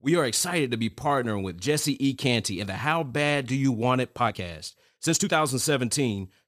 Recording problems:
uneven, jittery; strongly; from 1 to 5.5 s

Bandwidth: 14.5 kHz